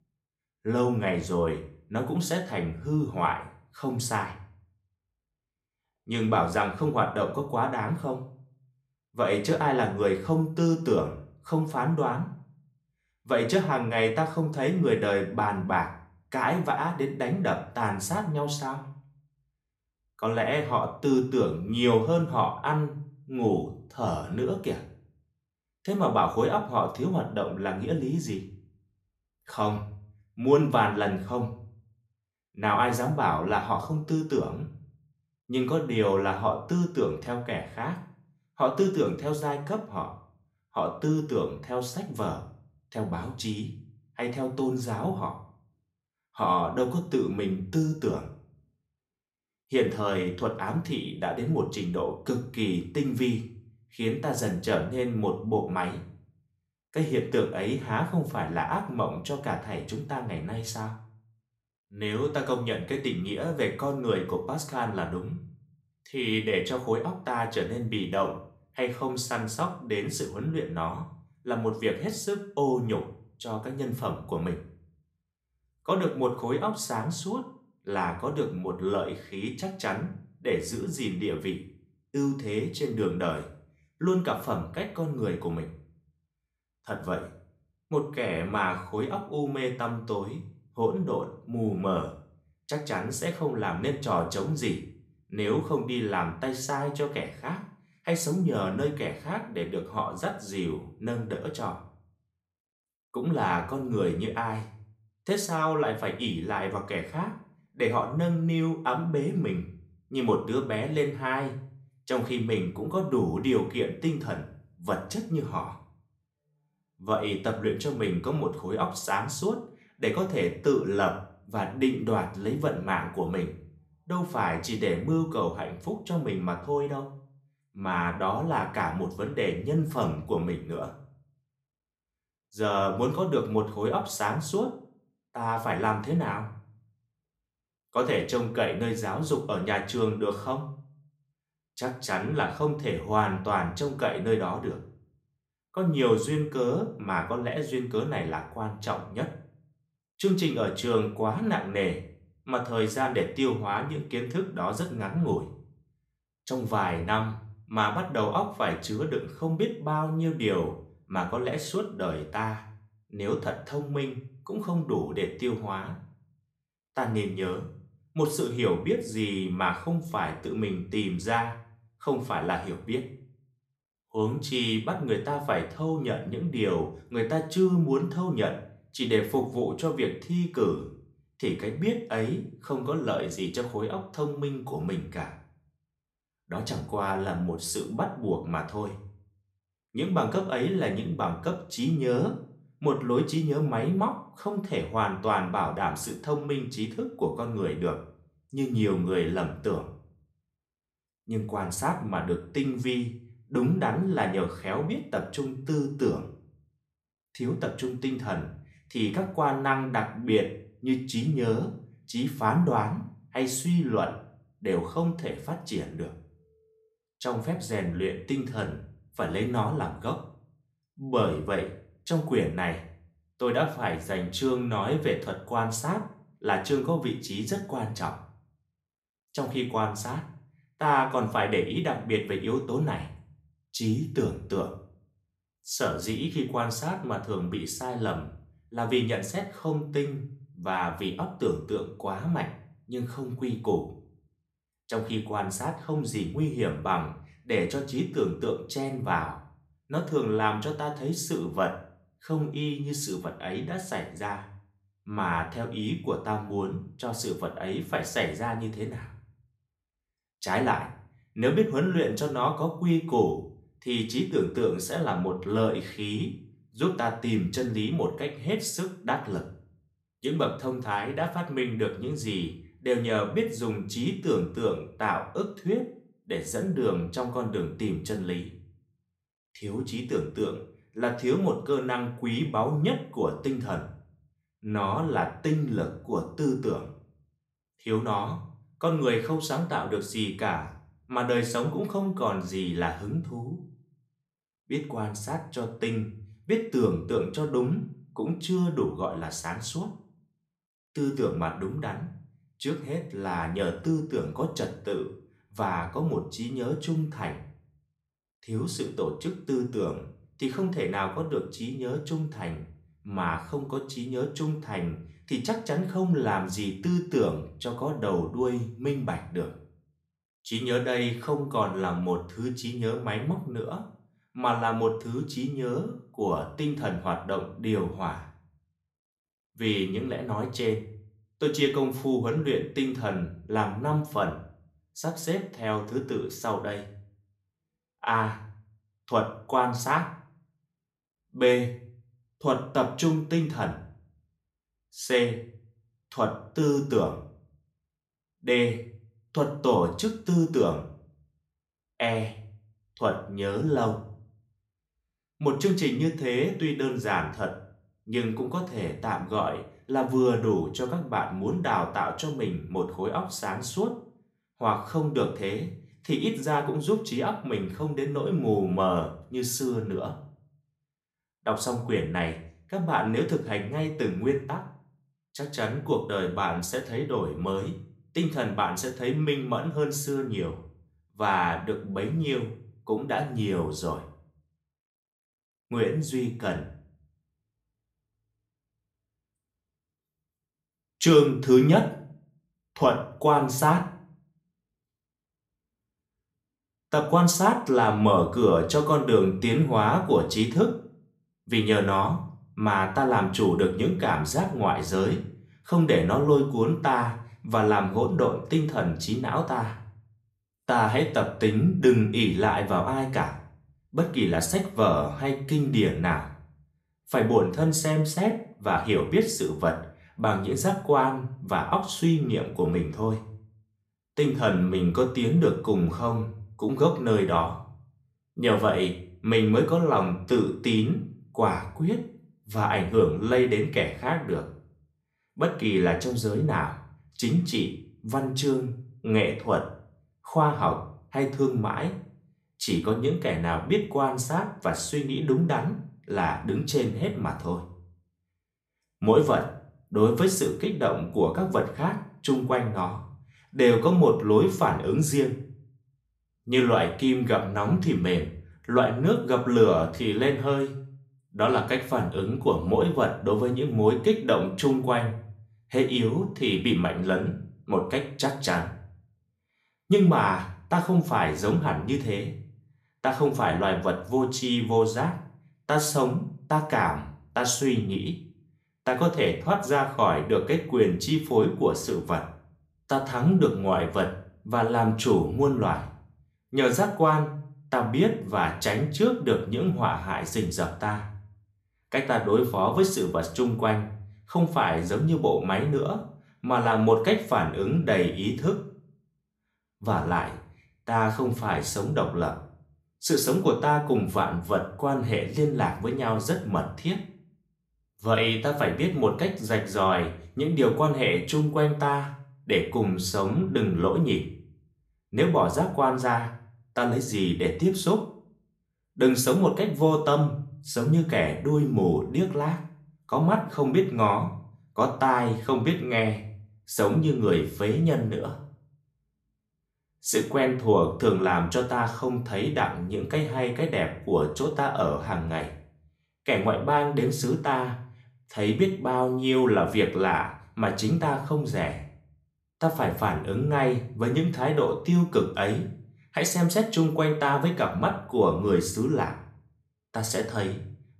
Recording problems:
room echo; slight; dies away in 0.4 s
off-mic speech; somewhat distant

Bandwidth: 14.5 kHz